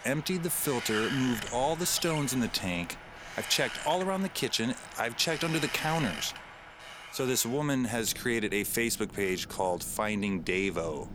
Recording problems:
wind in the background; noticeable; throughout; 10 dB below the speech

